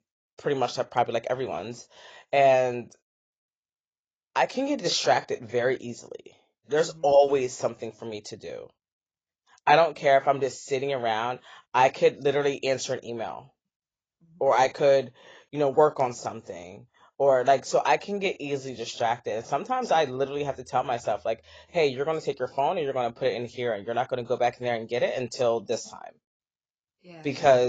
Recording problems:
garbled, watery; badly; nothing above 7.5 kHz
abrupt cut into speech; at the end

